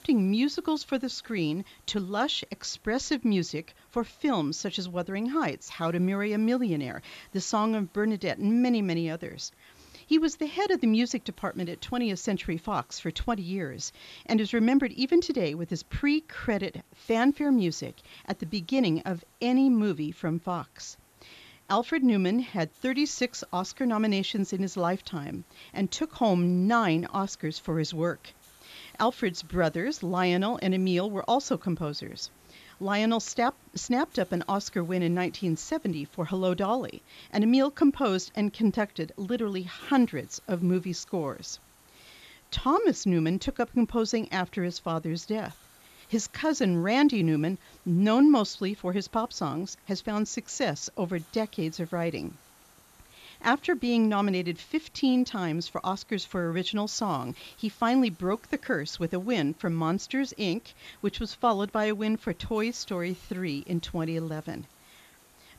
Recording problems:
high frequencies cut off; noticeable; nothing above 8 kHz
hiss; faint; throughout; 30 dB below the speech

